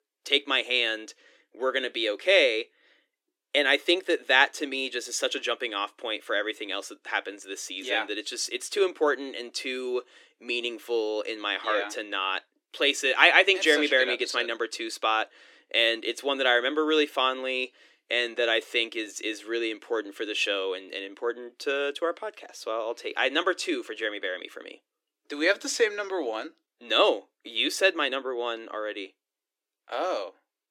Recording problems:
thin; somewhat; fading below 300 Hz

